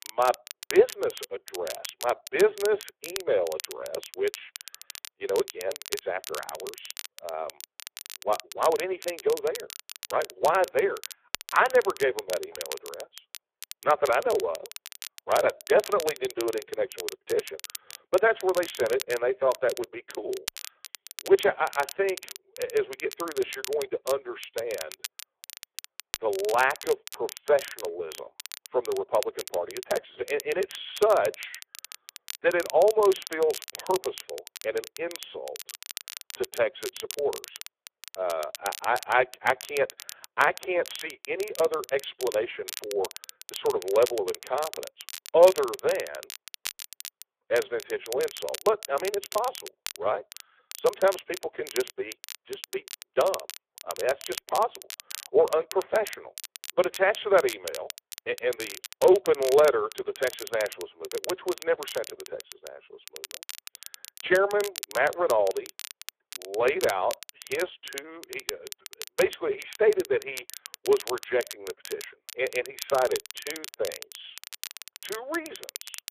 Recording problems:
phone-call audio; poor line
crackle, like an old record; noticeable; 15 dB below the speech

